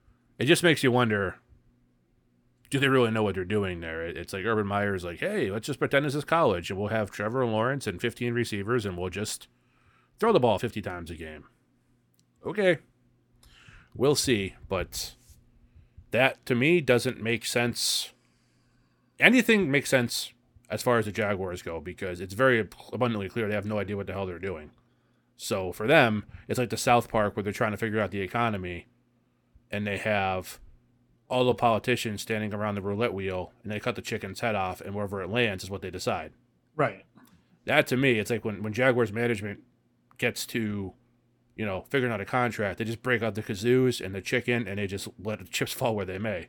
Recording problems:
uneven, jittery; slightly; from 7 to 32 s

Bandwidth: 18 kHz